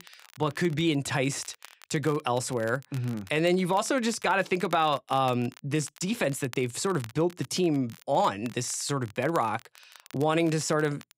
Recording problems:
crackle, like an old record; faint; 20 dB below the speech

